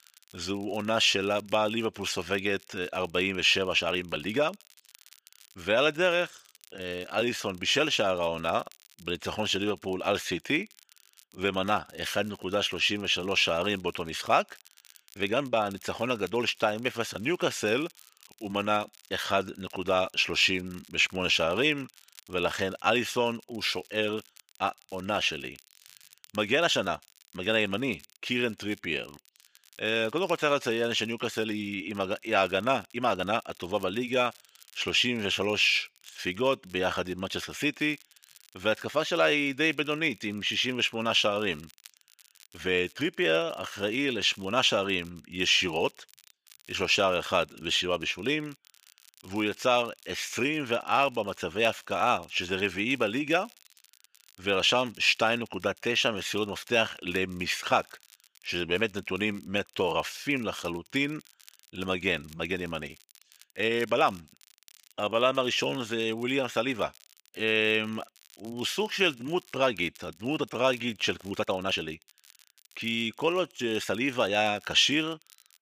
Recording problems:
thin; somewhat; fading below 750 Hz
crackle, like an old record; faint; 25 dB below the speech
uneven, jittery; strongly; from 4 s to 1:14

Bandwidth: 15 kHz